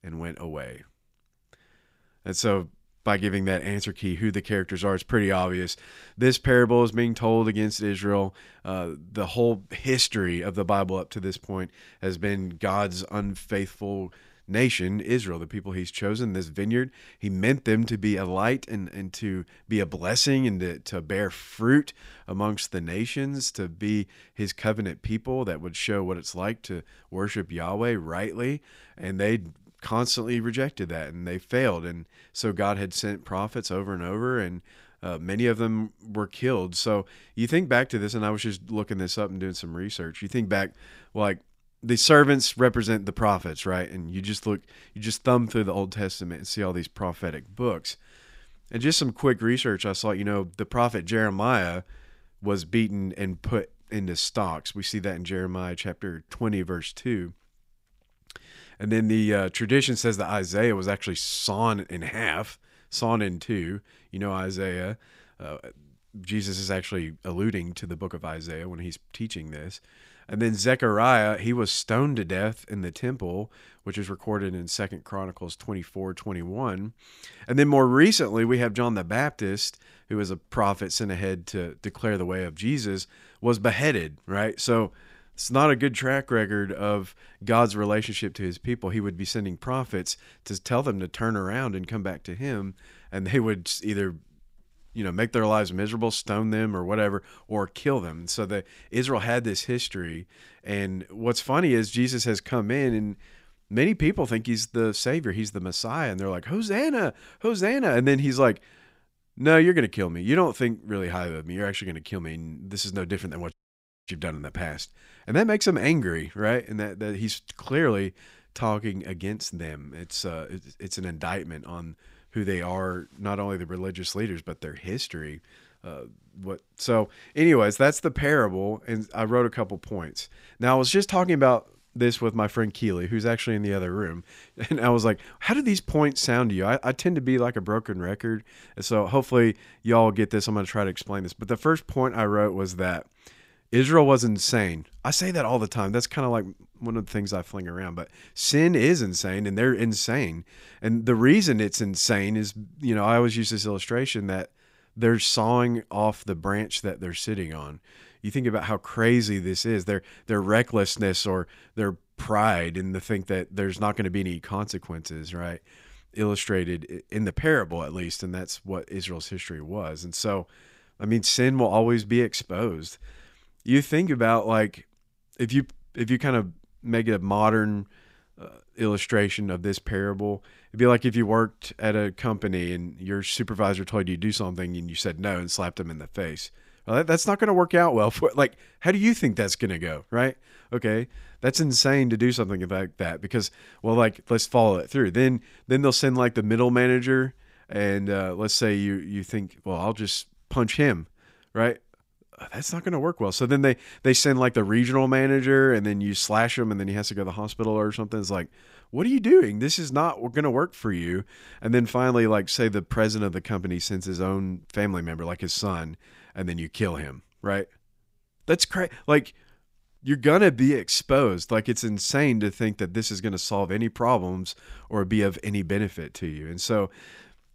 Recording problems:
audio cutting out; at 1:54 for 0.5 s

